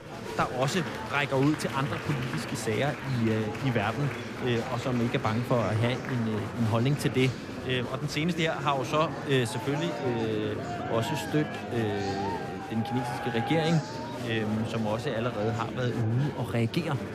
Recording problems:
murmuring crowd; loud; throughout; 6 dB below the speech

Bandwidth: 14.5 kHz